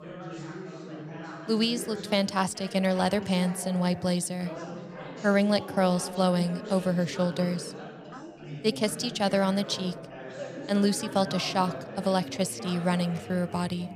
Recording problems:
background chatter; noticeable; throughout; 4 voices, 10 dB below the speech

